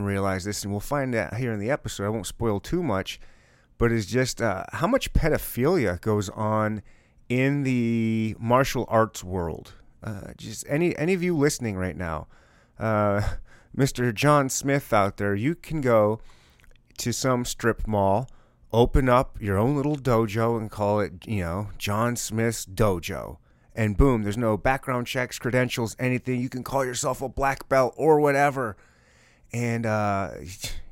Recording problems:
abrupt cut into speech; at the start

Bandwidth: 16 kHz